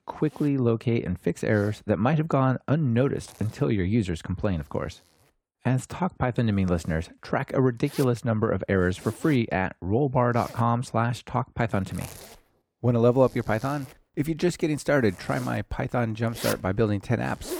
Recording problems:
household noises; noticeable; throughout; 15 dB below the speech

